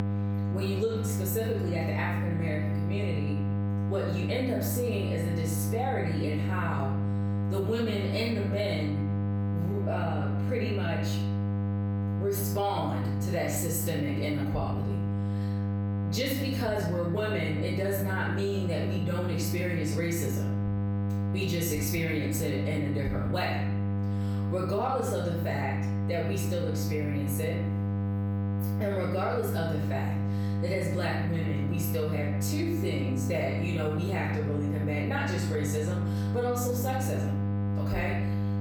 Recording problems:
off-mic speech; far
room echo; noticeable; dies away in 0.7 s
squashed, flat; somewhat
electrical hum; loud; throughout; 50 Hz, 7 dB below the speech

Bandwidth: 18.5 kHz